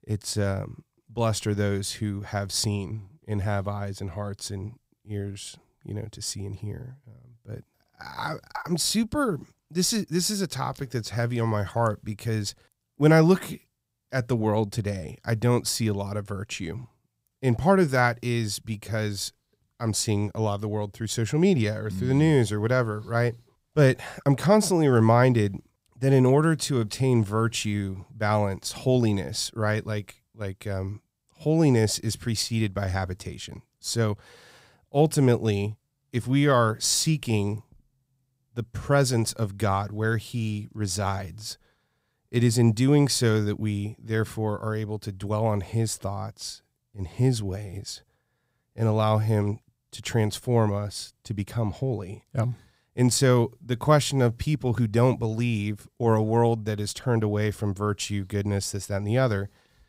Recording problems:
none

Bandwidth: 15.5 kHz